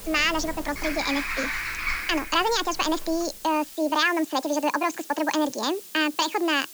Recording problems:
wrong speed and pitch; too fast and too high; 1.7 times normal speed
high frequencies cut off; noticeable; nothing above 8 kHz
animal sounds; loud; until 3 s; 5 dB below the speech
hiss; noticeable; throughout; 15 dB below the speech

